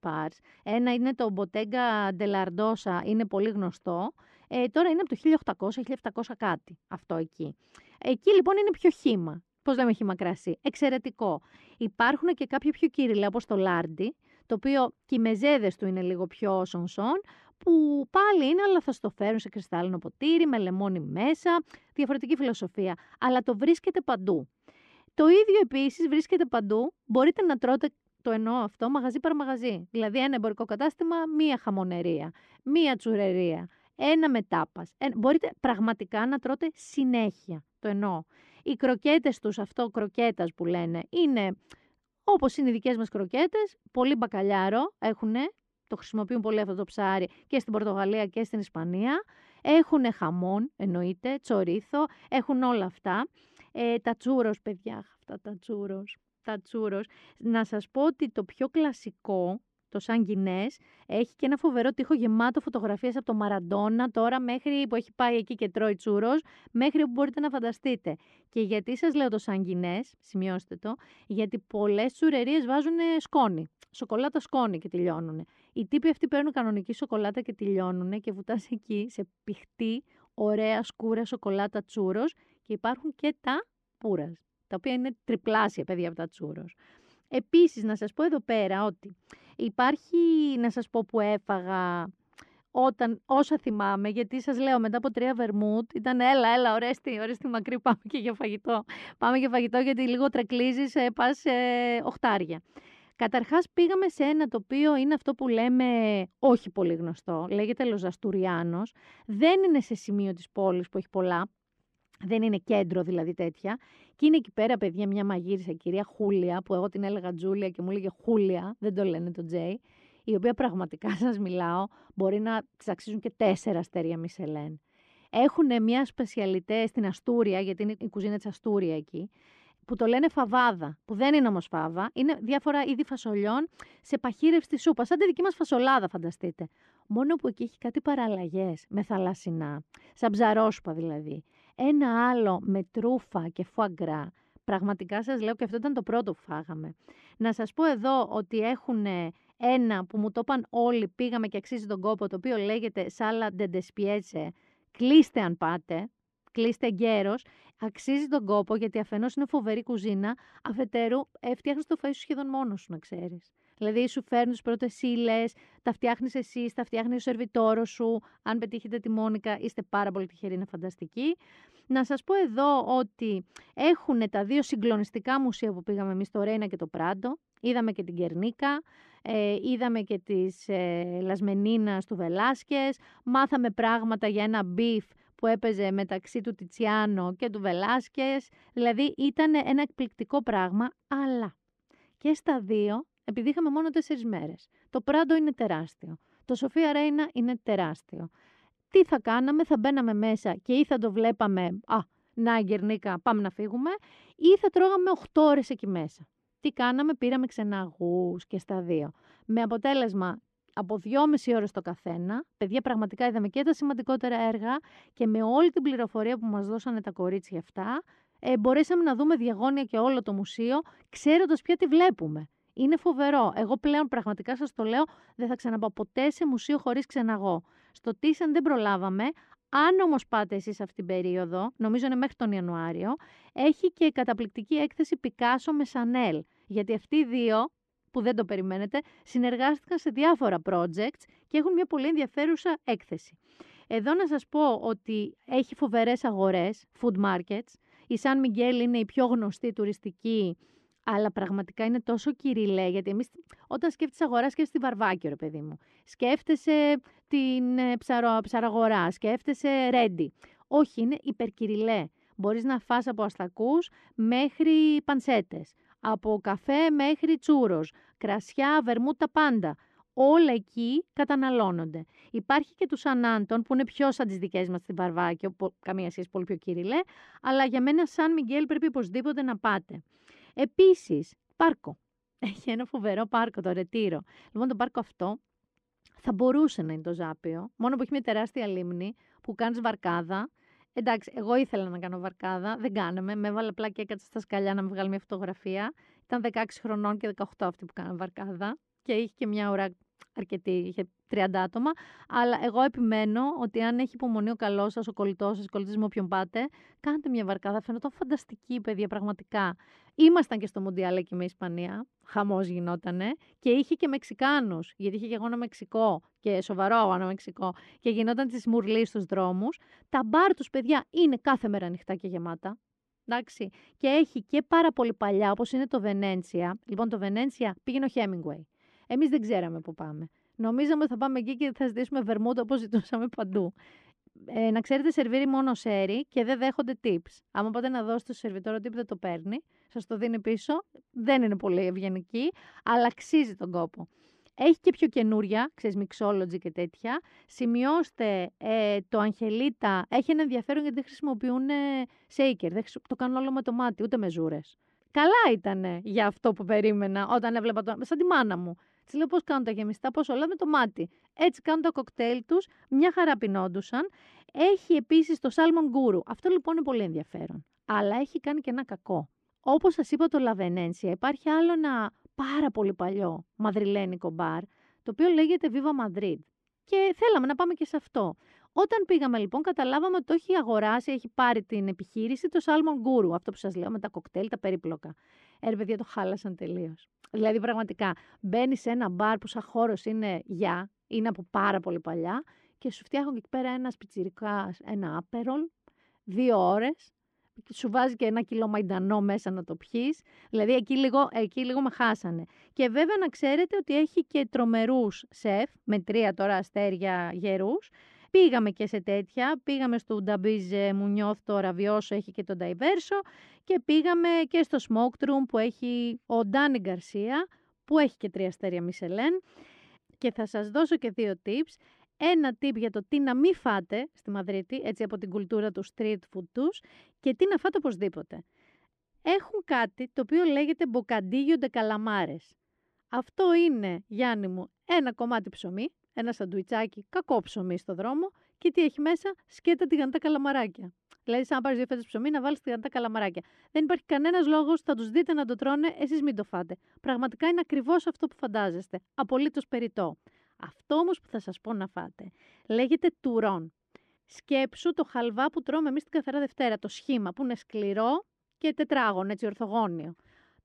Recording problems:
muffled; slightly; fading above 3.5 kHz

